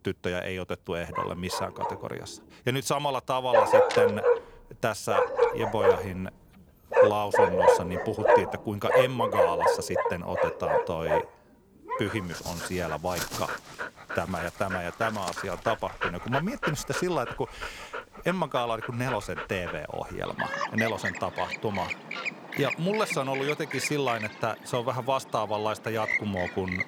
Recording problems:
animal sounds; very loud; throughout; 3 dB above the speech

